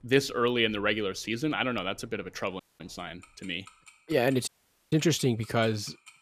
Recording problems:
household noises; faint; throughout; 25 dB below the speech
audio cutting out; at 2.5 s and at 4.5 s

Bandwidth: 14.5 kHz